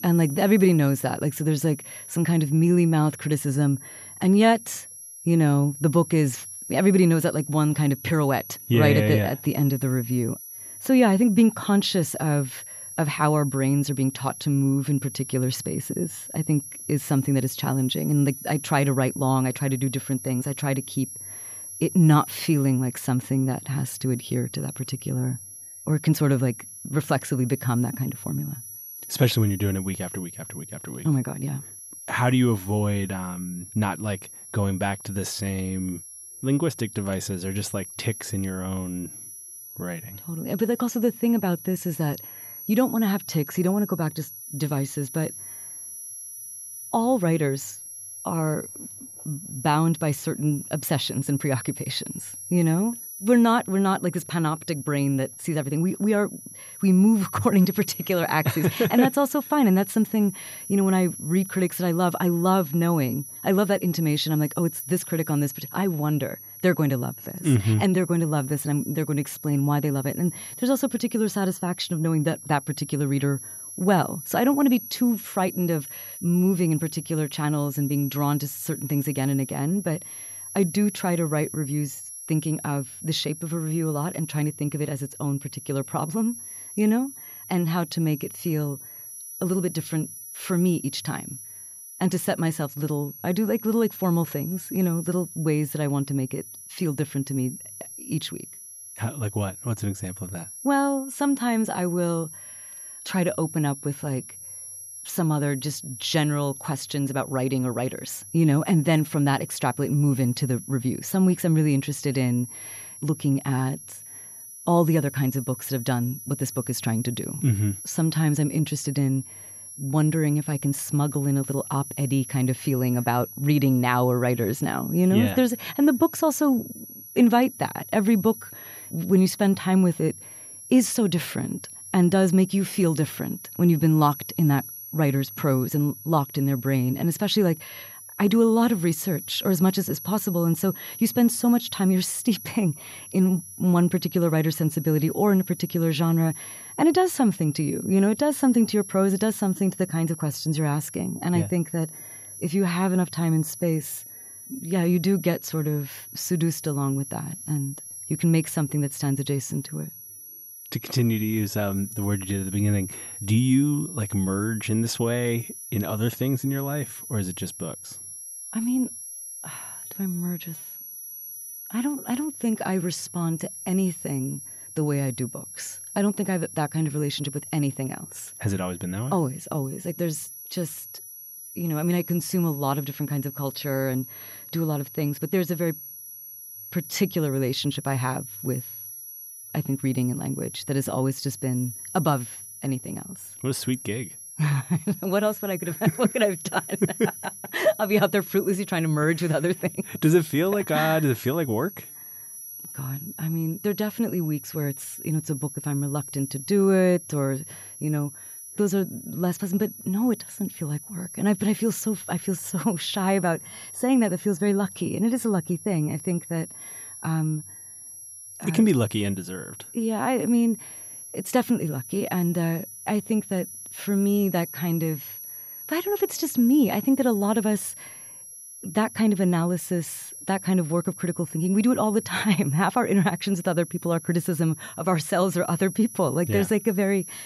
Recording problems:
high-pitched whine; noticeable; throughout; 11 kHz, 10 dB below the speech

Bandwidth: 14.5 kHz